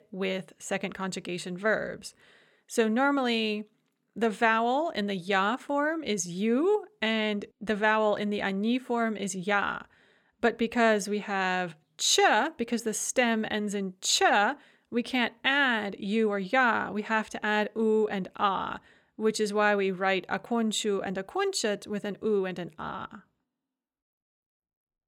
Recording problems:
none

